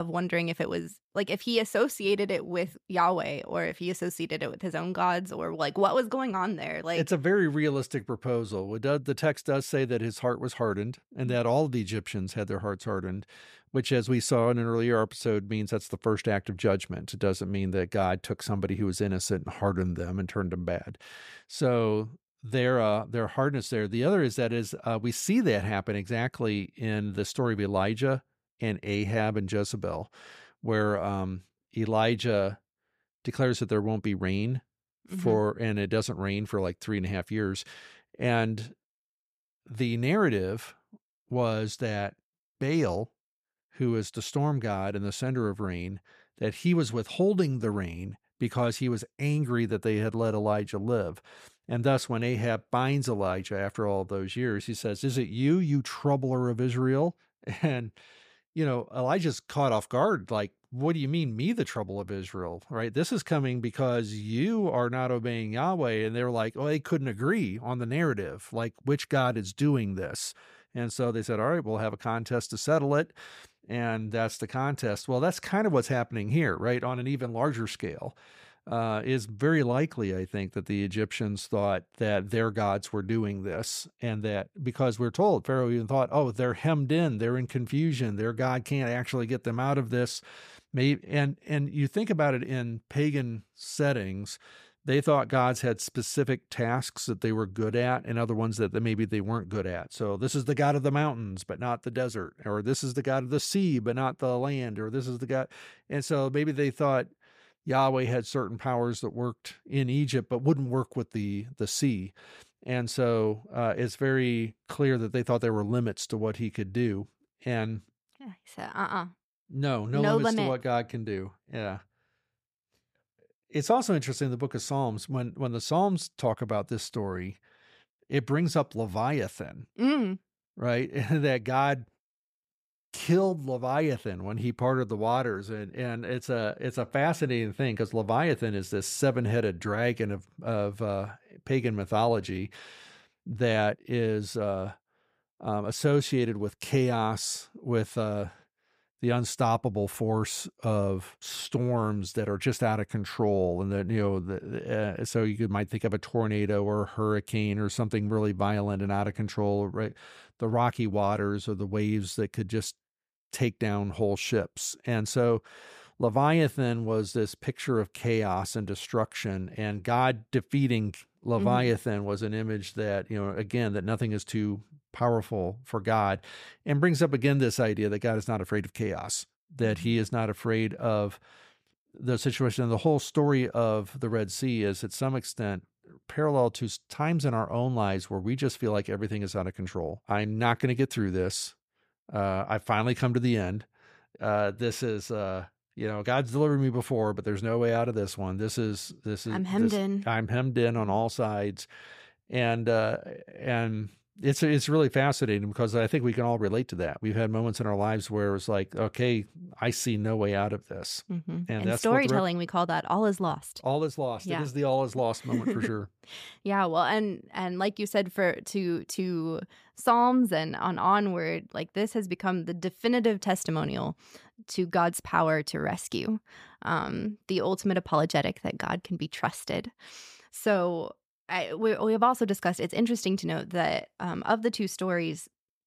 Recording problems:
abrupt cut into speech; at the start

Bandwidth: 15 kHz